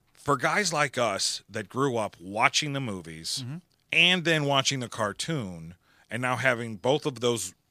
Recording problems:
none

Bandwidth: 15 kHz